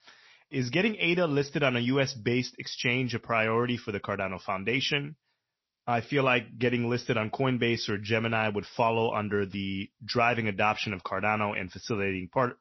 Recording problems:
high frequencies cut off; noticeable; nothing above 6 kHz
garbled, watery; slightly

